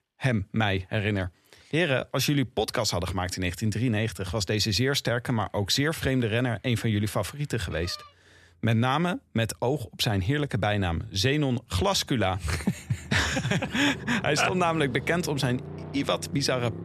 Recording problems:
traffic noise; noticeable; throughout; 15 dB below the speech

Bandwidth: 13.5 kHz